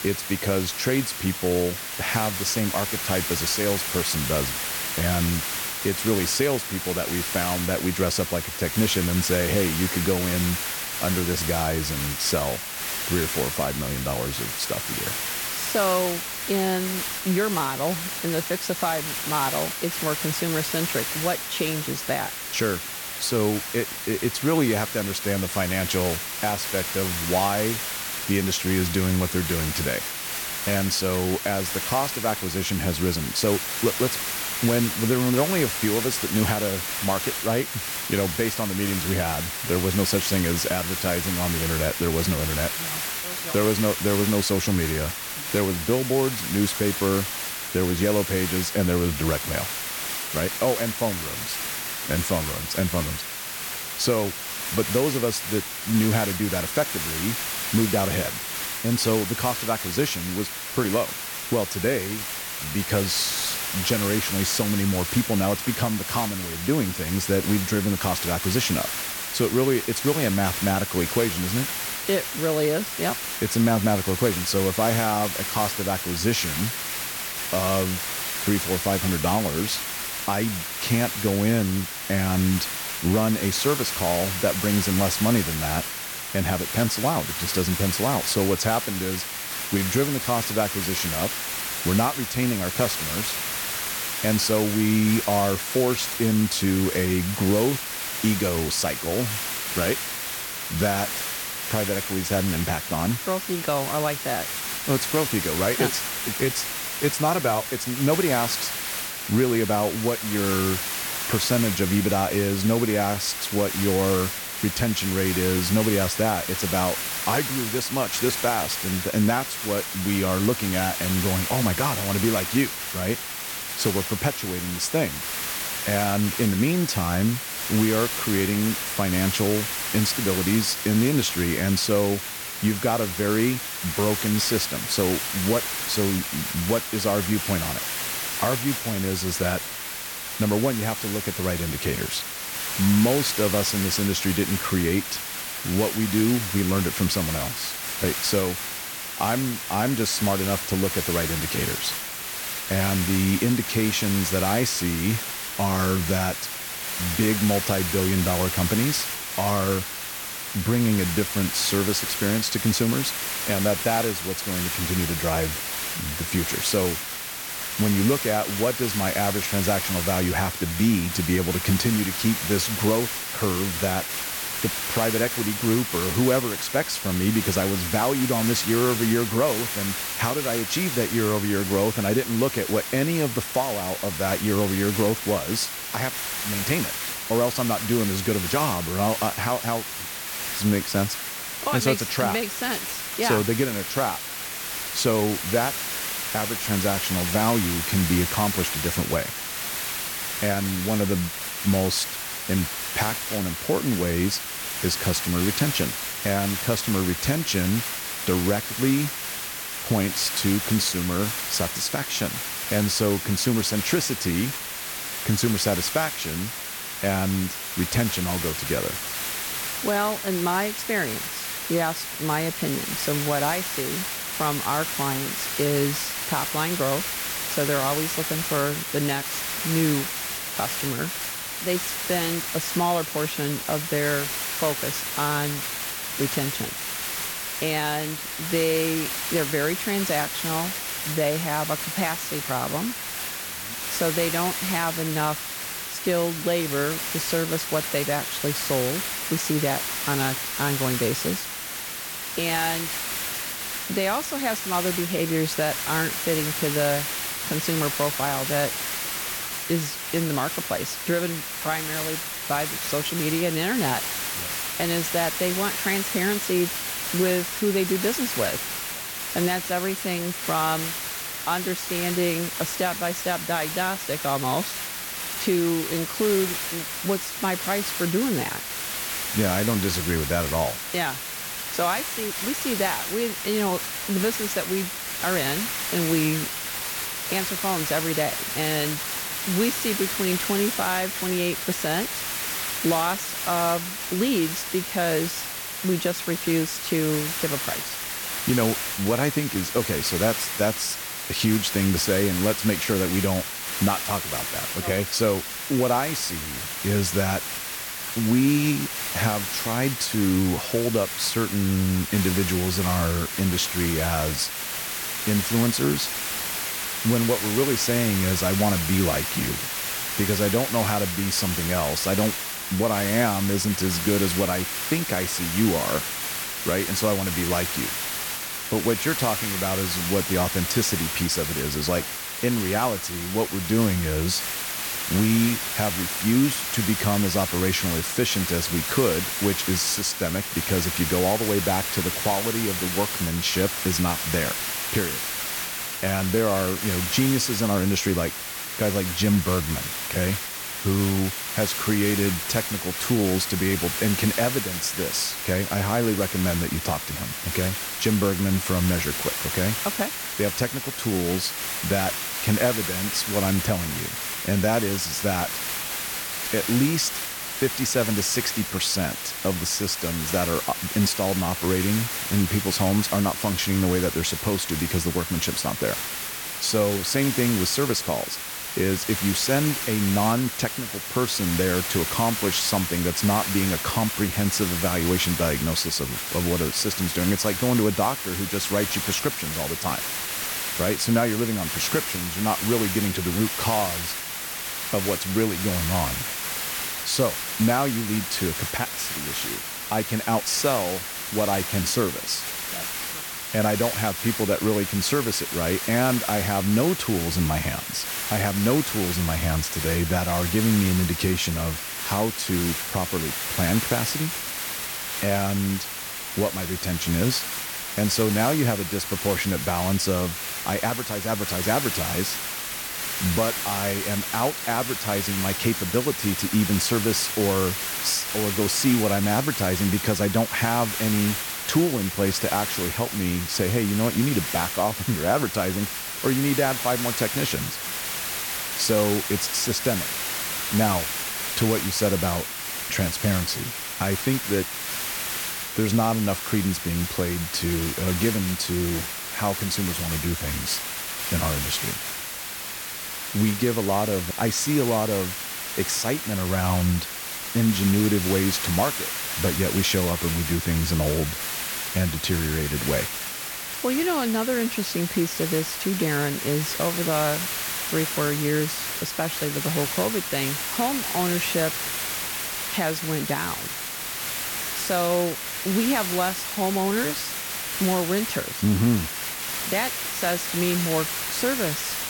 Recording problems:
hiss; loud; throughout; 2 dB below the speech

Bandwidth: 17 kHz